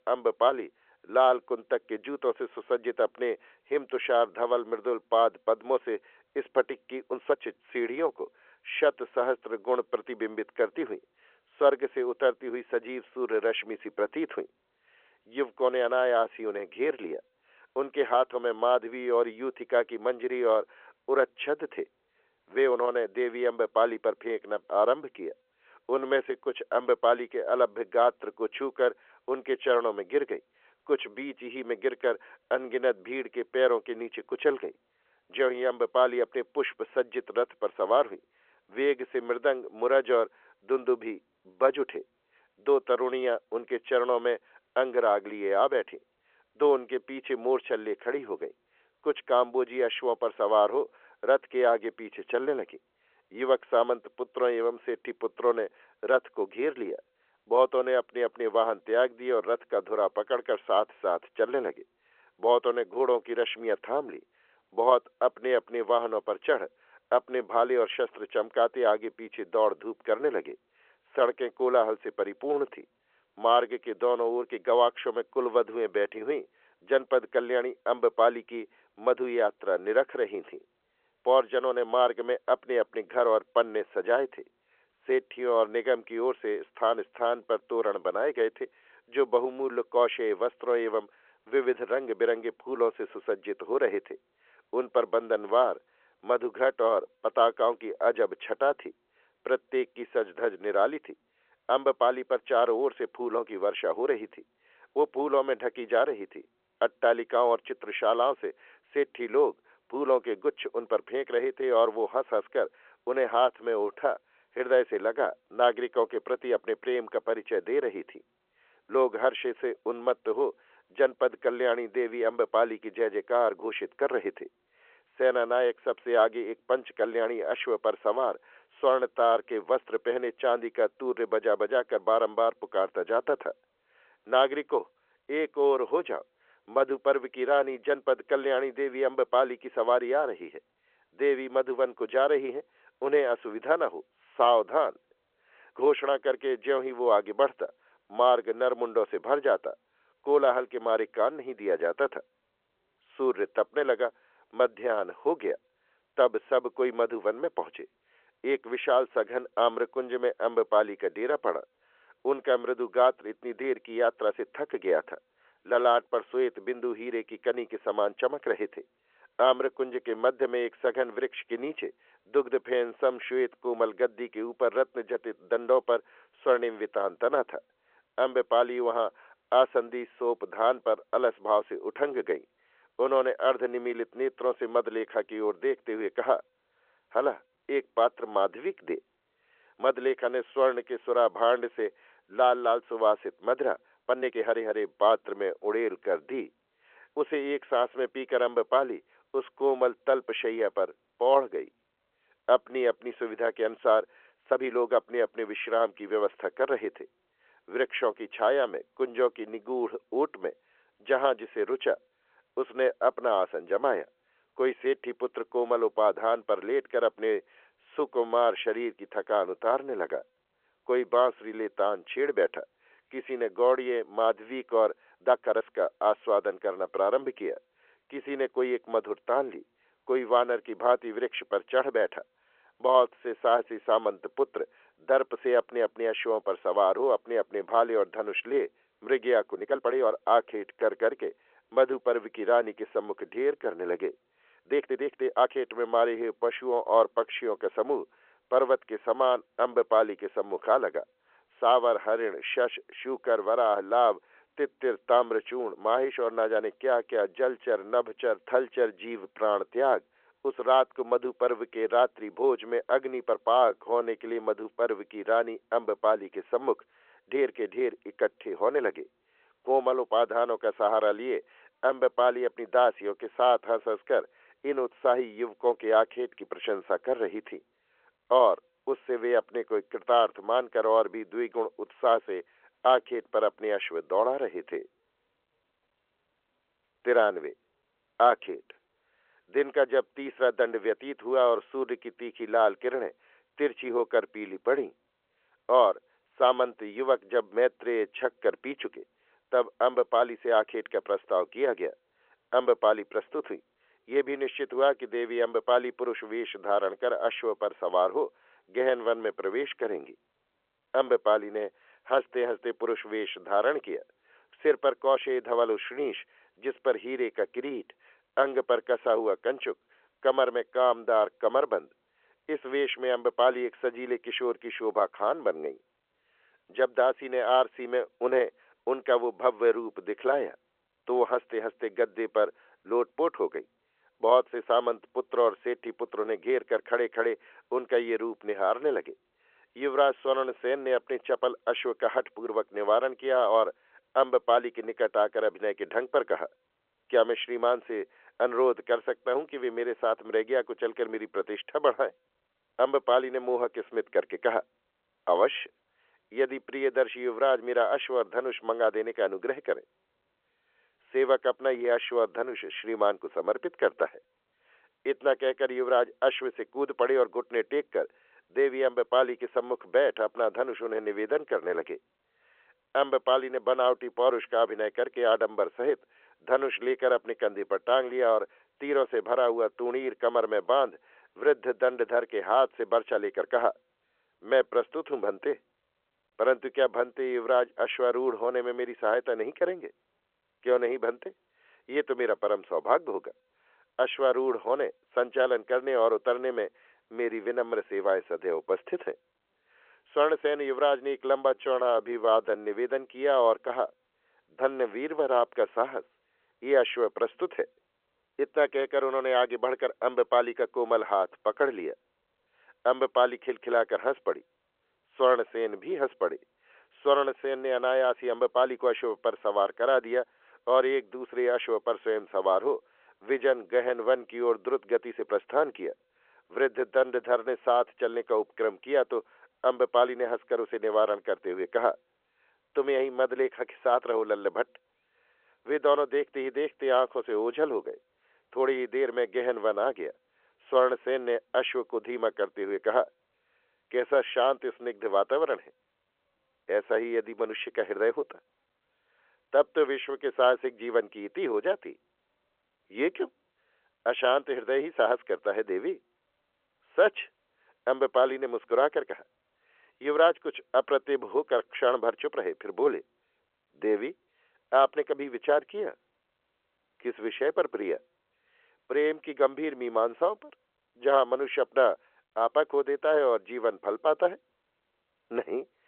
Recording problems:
phone-call audio; nothing above 3.5 kHz
uneven, jittery; strongly; from 7 s to 6:43

